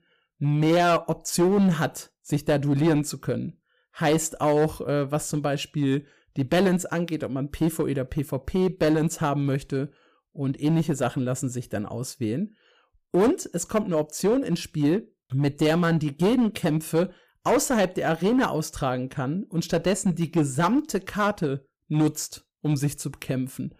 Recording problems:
distortion; slight; 6% of the sound clipped

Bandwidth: 15 kHz